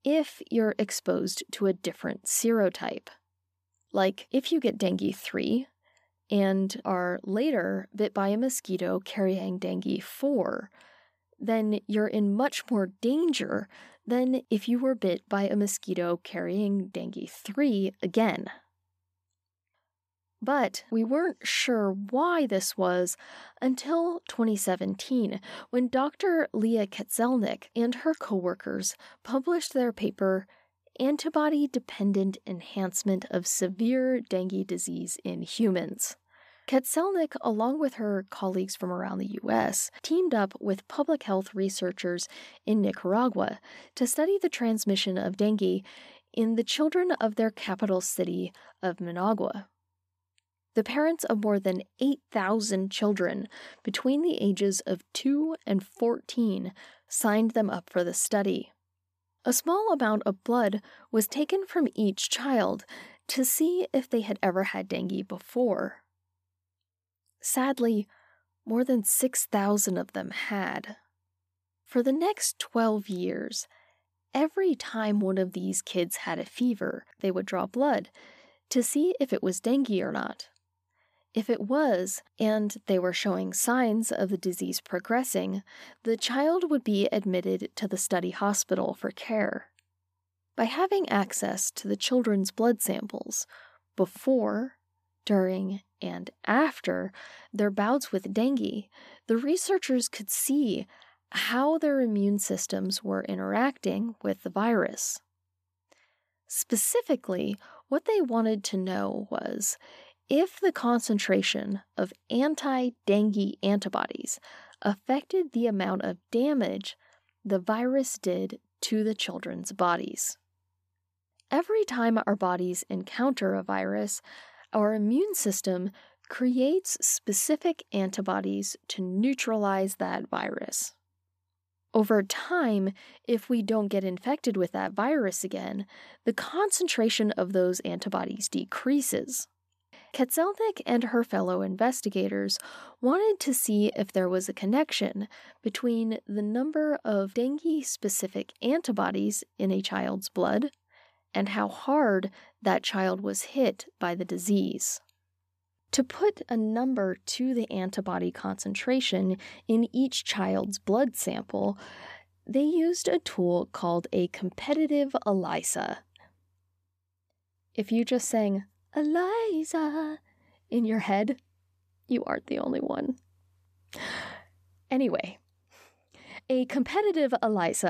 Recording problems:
abrupt cut into speech; at the end

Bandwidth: 14.5 kHz